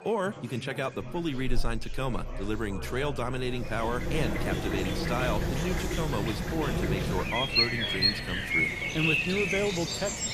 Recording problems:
animal sounds; very loud; from 4 s on; 4 dB above the speech
traffic noise; noticeable; throughout; 15 dB below the speech
chatter from many people; noticeable; throughout; 10 dB below the speech

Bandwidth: 14.5 kHz